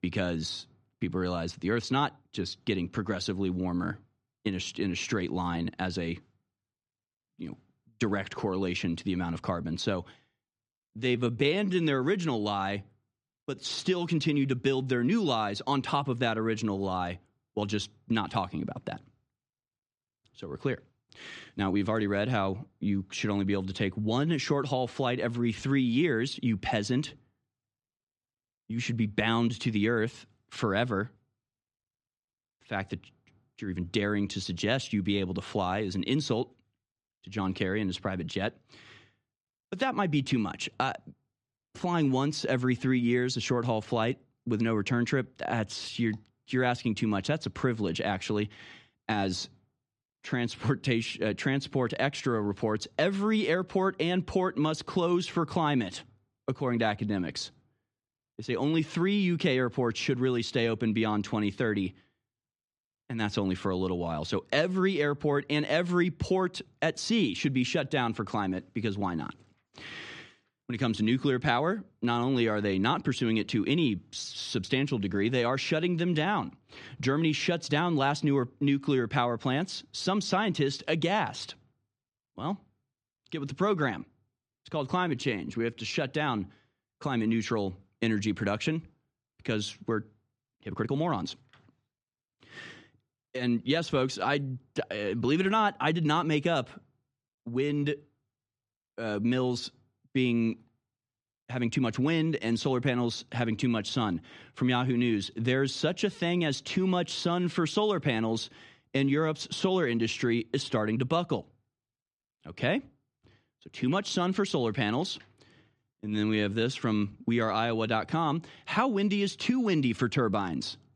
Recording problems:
uneven, jittery; strongly; from 11 s to 1:57

